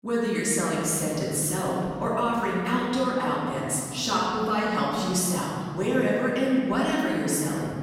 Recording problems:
room echo; strong; dies away in 2.3 s
off-mic speech; far

